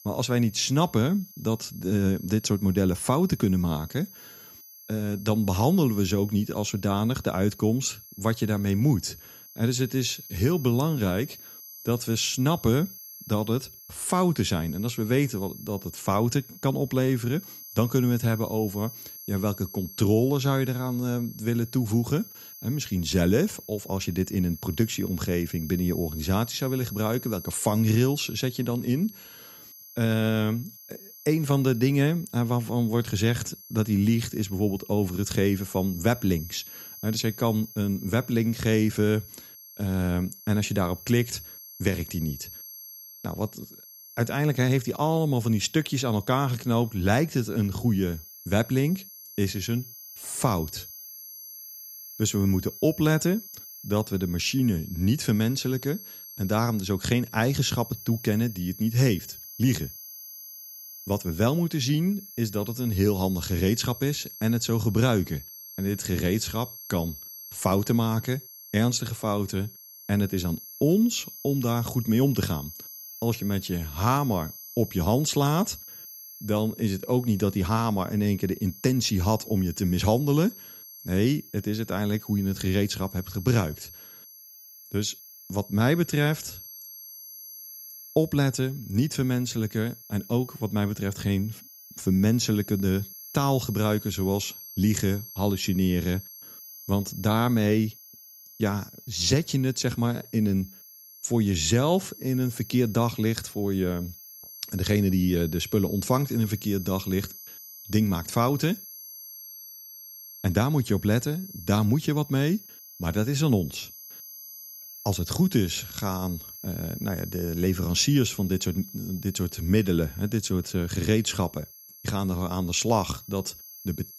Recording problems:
high-pitched whine; noticeable; throughout; 12 kHz, 15 dB below the speech

